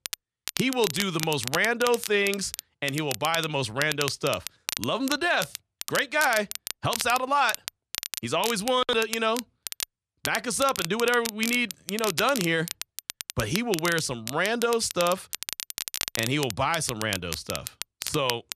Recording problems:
crackle, like an old record; loud; 7 dB below the speech

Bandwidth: 14 kHz